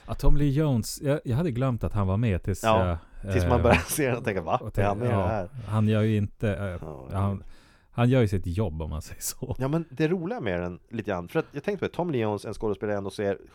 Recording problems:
none

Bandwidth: 18 kHz